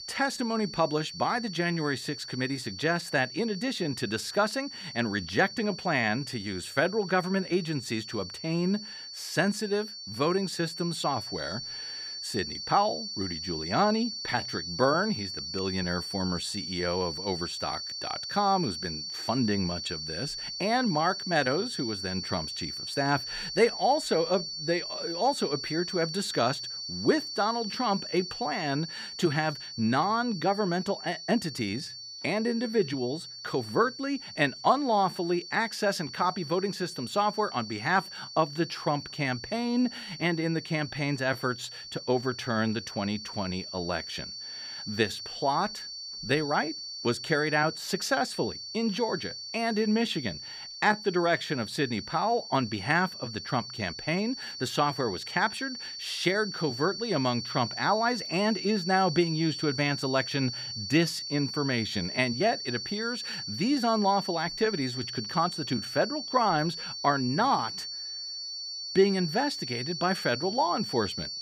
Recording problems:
high-pitched whine; loud; throughout; 4.5 kHz, 7 dB below the speech

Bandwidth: 15 kHz